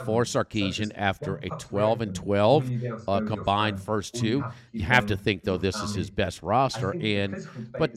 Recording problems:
voice in the background; loud; throughout; 9 dB below the speech

